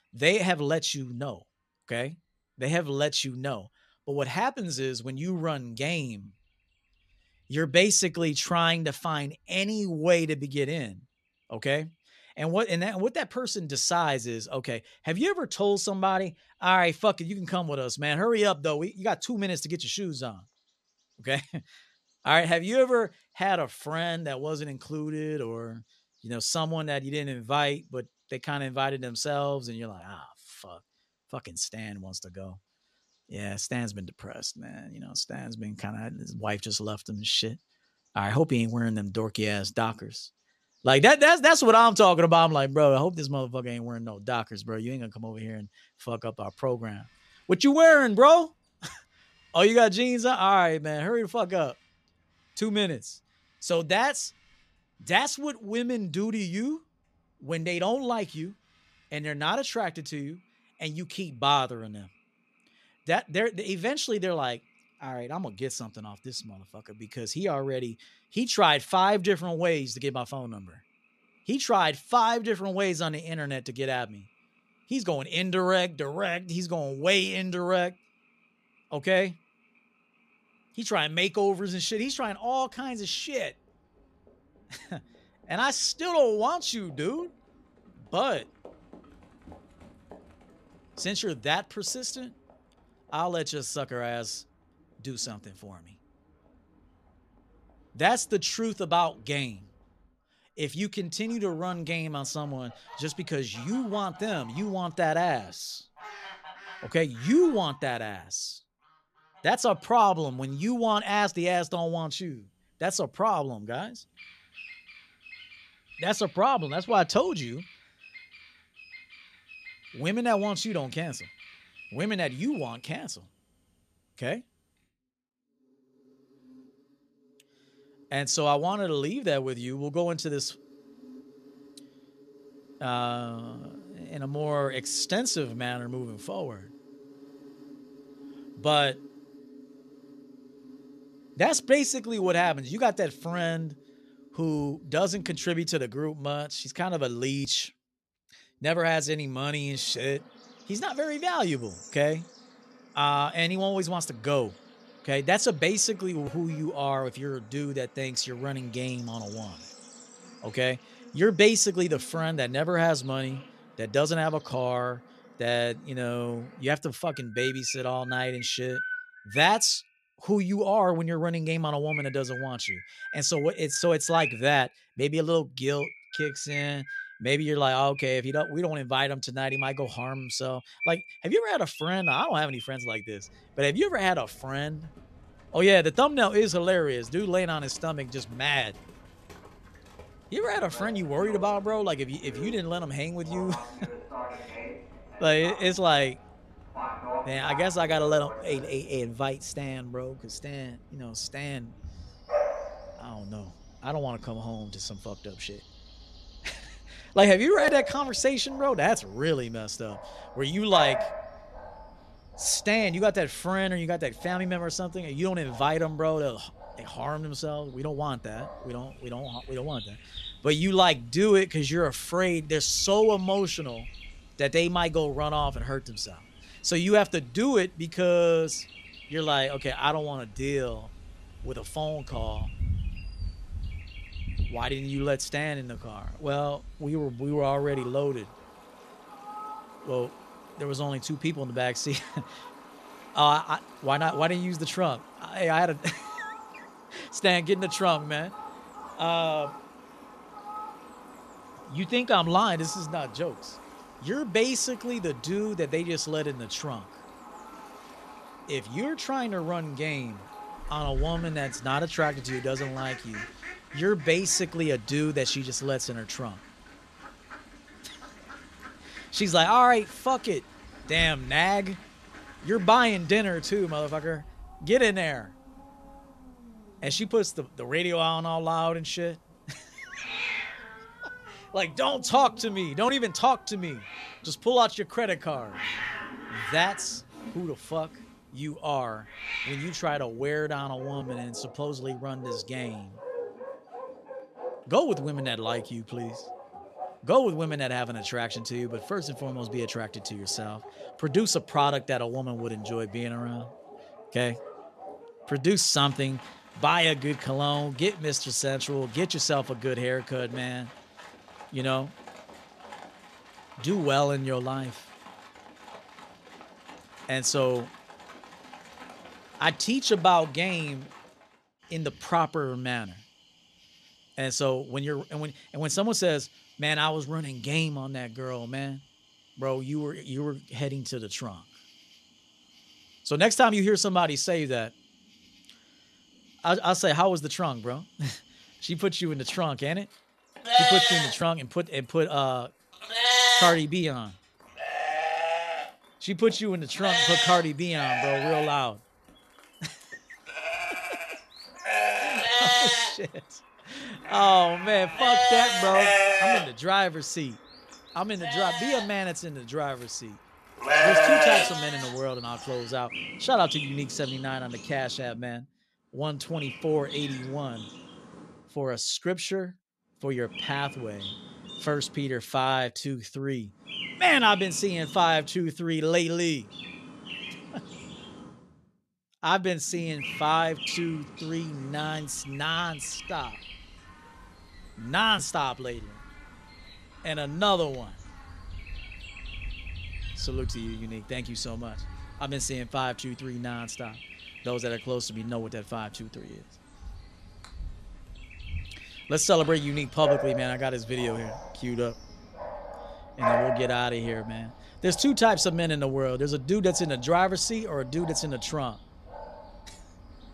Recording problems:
animal sounds; loud; throughout; 4 dB below the speech

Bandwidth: 13.5 kHz